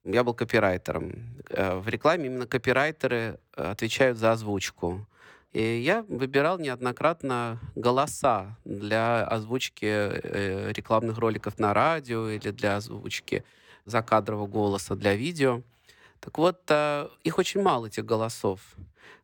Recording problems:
none

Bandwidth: 17.5 kHz